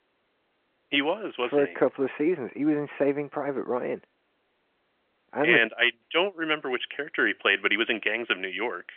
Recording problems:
phone-call audio; nothing above 3.5 kHz

